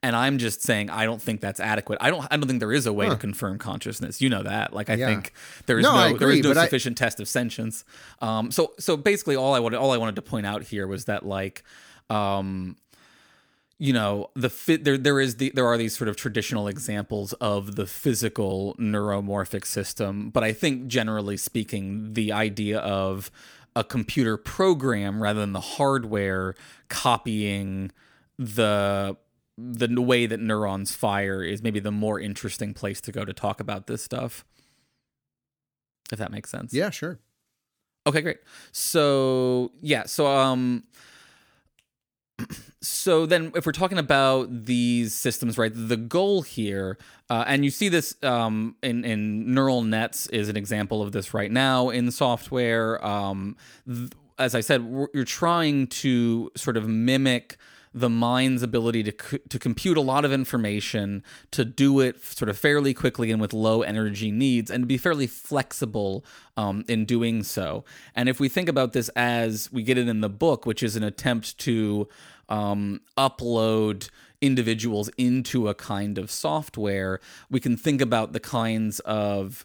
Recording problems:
none

